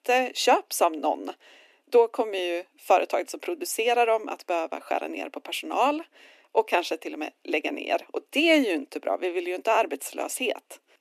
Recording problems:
thin; very slightly; fading below 250 Hz

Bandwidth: 14 kHz